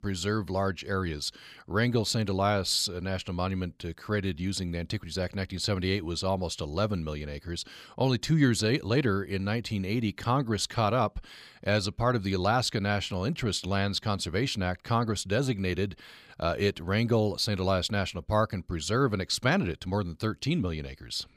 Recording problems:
none

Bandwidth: 15 kHz